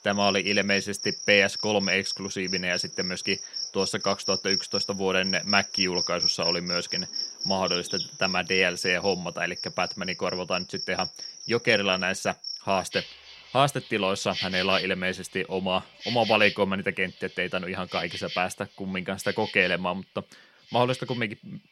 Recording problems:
animal sounds; loud; throughout; 4 dB below the speech

